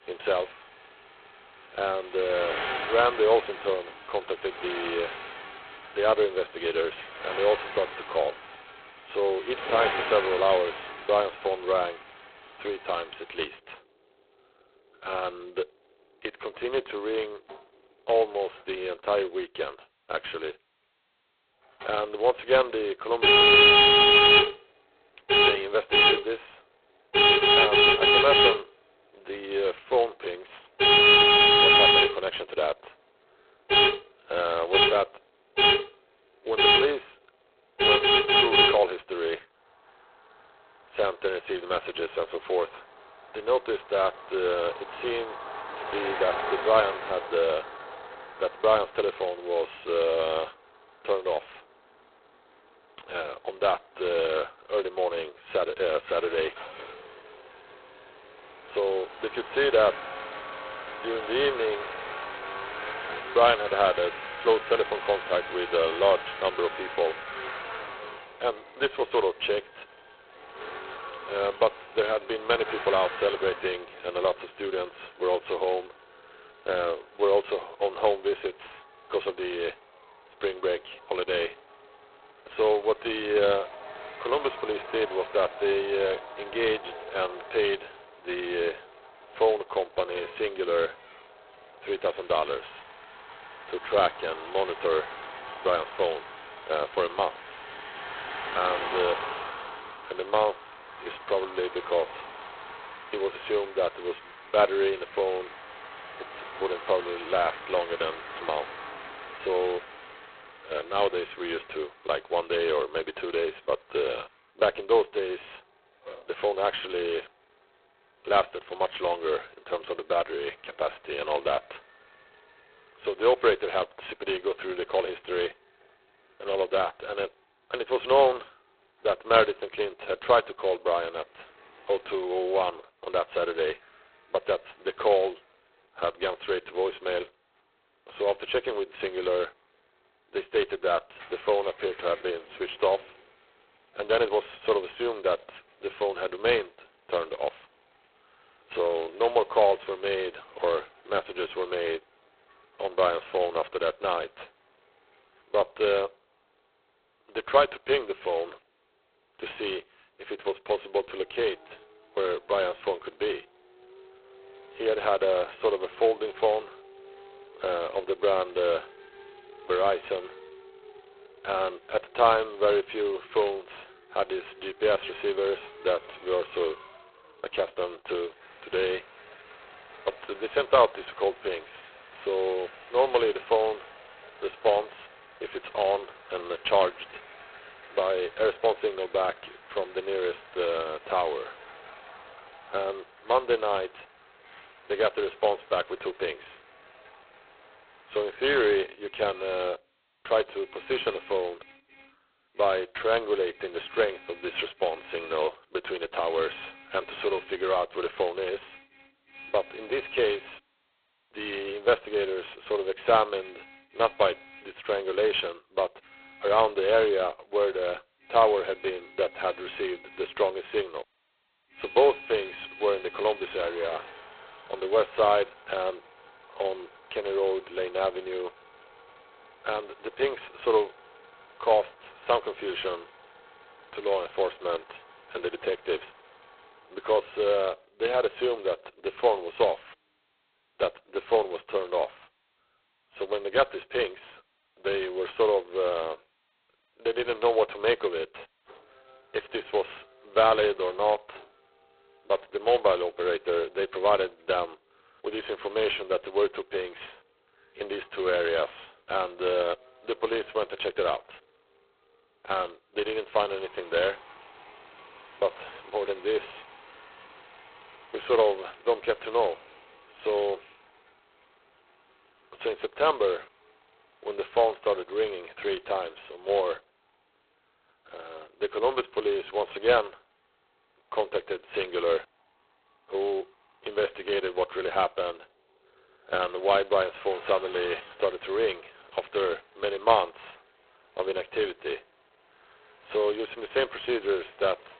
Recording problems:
phone-call audio; poor line; nothing above 4 kHz
traffic noise; very loud; throughout; 4 dB above the speech

